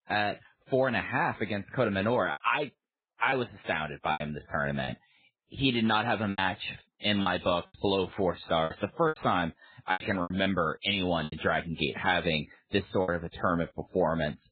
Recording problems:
garbled, watery; badly
high frequencies cut off; severe; nothing above 4 kHz
choppy; very; 8% of the speech affected

